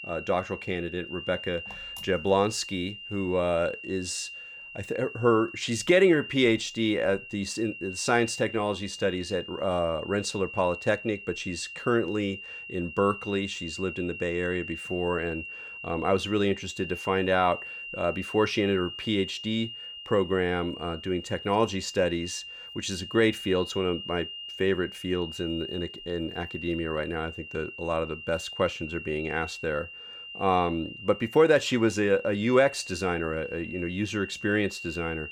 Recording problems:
high-pitched whine; noticeable; throughout; 3 kHz, 10 dB below the speech

